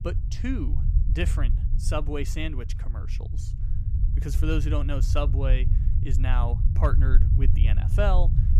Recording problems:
low rumble; loud; throughout; 10 dB below the speech

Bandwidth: 15.5 kHz